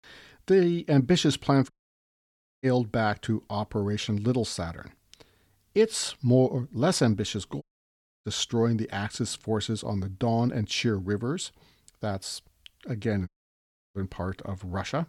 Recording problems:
audio cutting out; at 1.5 s for 1 s, at 7.5 s for 0.5 s and at 13 s for 0.5 s

